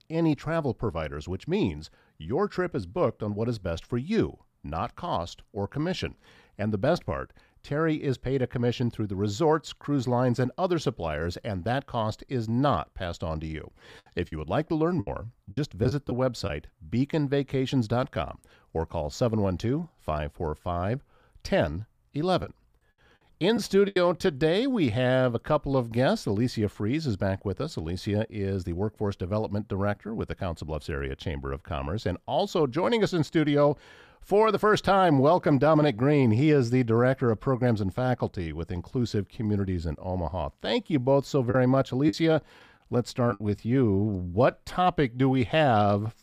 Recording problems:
choppy; very; from 14 to 16 s, from 22 to 24 s and from 42 to 43 s; 9% of the speech affected

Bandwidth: 15 kHz